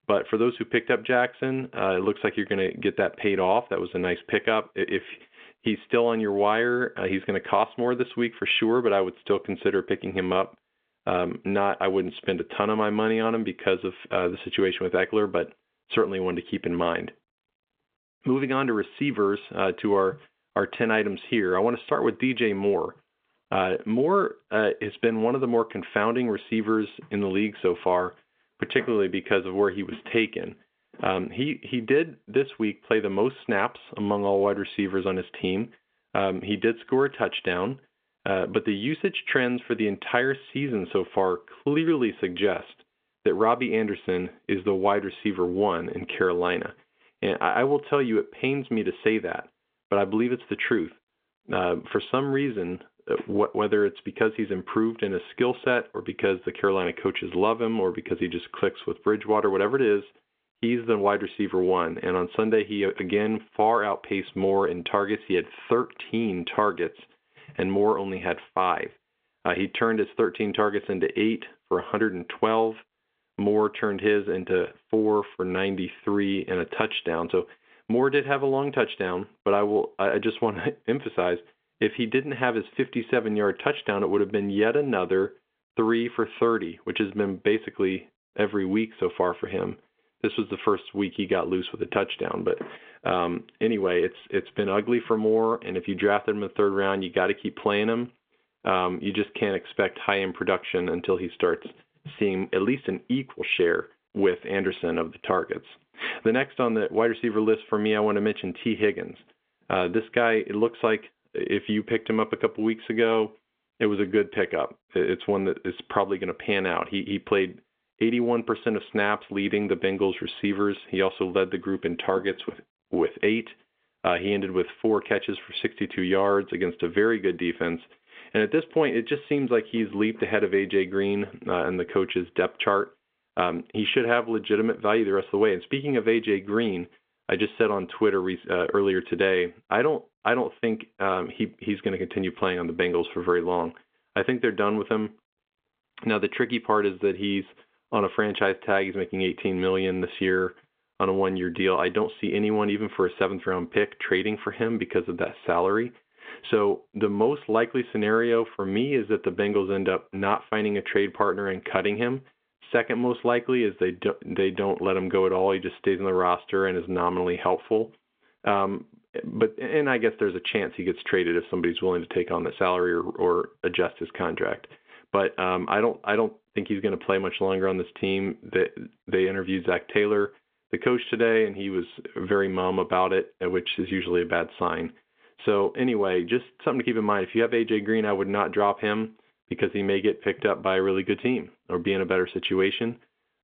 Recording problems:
phone-call audio; nothing above 3.5 kHz

